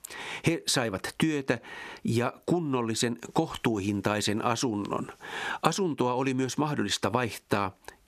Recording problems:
squashed, flat; heavily

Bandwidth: 14.5 kHz